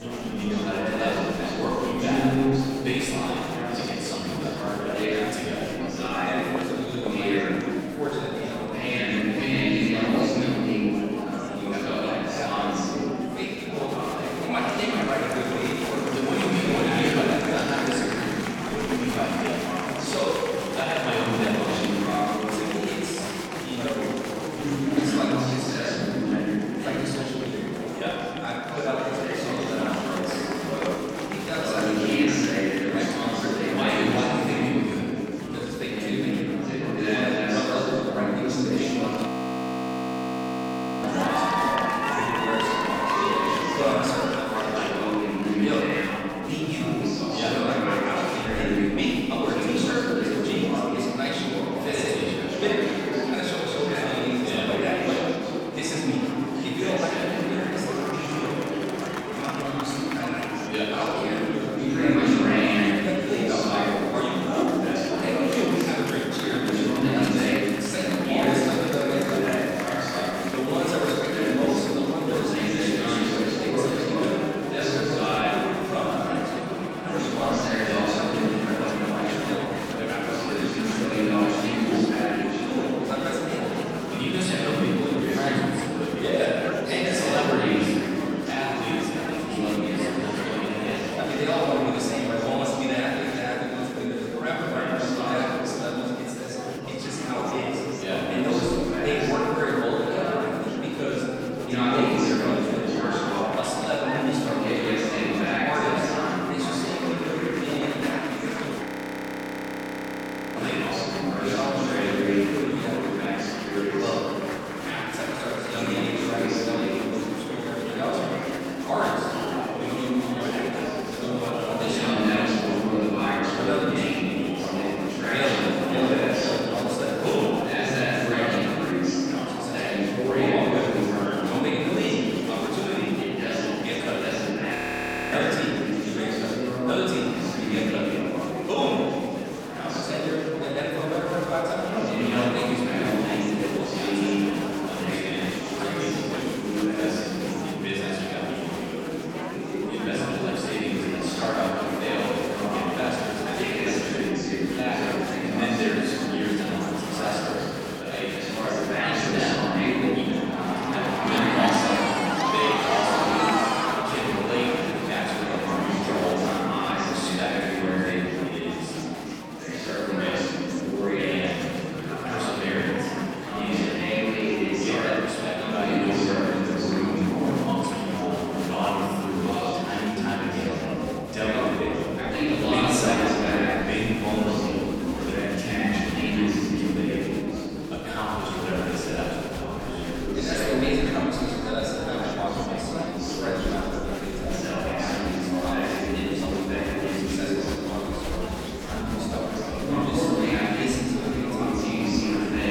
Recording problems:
room echo; strong; dies away in 2.4 s
off-mic speech; far
chatter from many people; very loud; throughout; 1 dB above the speech
audio freezing; at 39 s for 2 s, at 1:49 for 1.5 s and at 2:15 for 0.5 s

